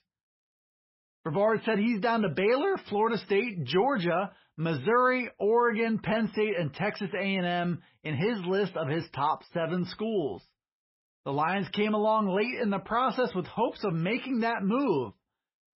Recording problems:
garbled, watery; badly; nothing above 5.5 kHz

